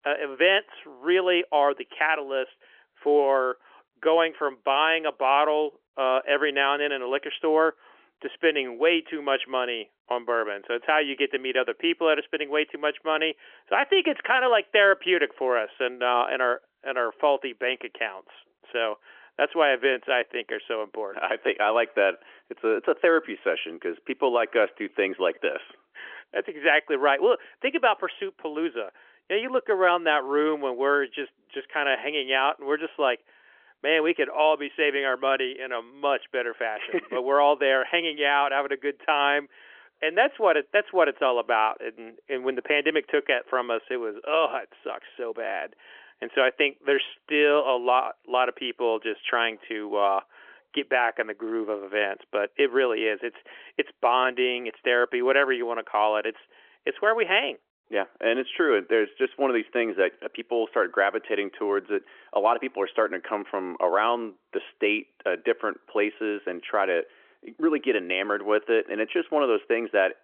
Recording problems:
phone-call audio; nothing above 3.5 kHz

